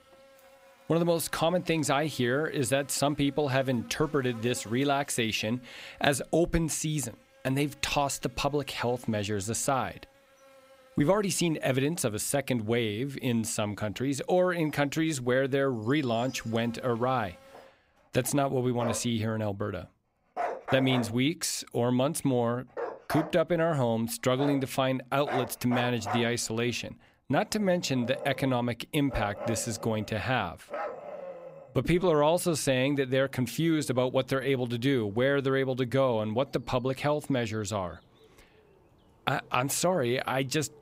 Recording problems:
animal sounds; noticeable; throughout; 10 dB below the speech

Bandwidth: 15.5 kHz